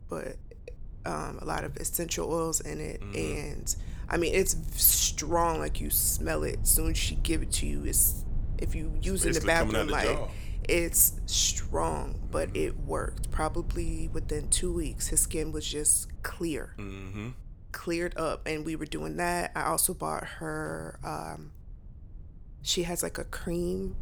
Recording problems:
low rumble; faint; throughout; 25 dB below the speech

